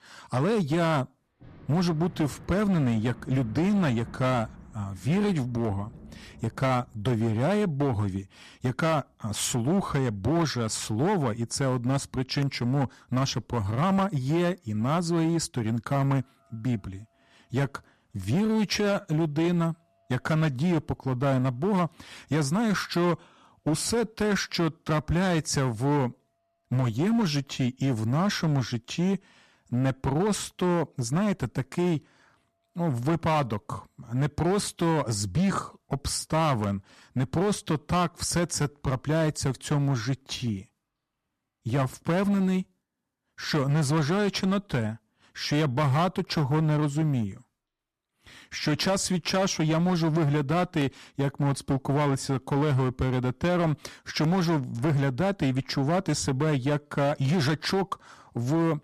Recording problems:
distortion; slight; 12% of the sound clipped
rain or running water; faint; throughout; 25 dB below the speech

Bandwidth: 14 kHz